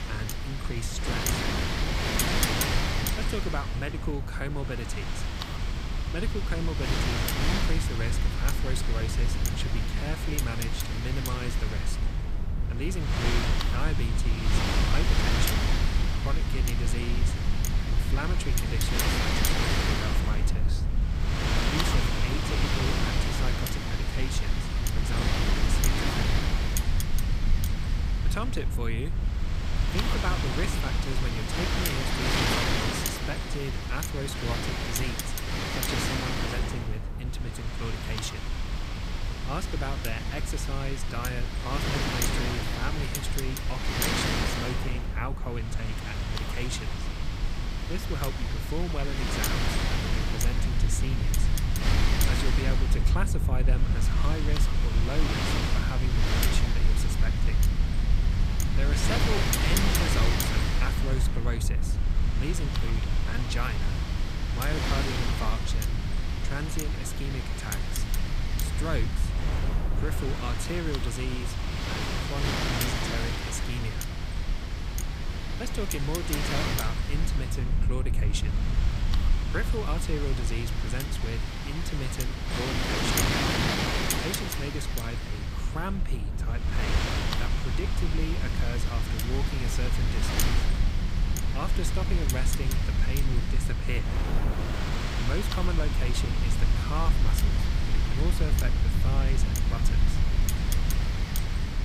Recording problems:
wind noise on the microphone; heavy; 5 dB above the speech
low rumble; loud; throughout; 9 dB below the speech

